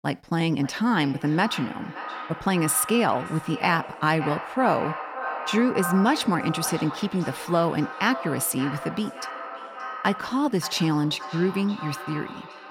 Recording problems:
echo of what is said; strong; throughout; 570 ms later, 10 dB below the speech

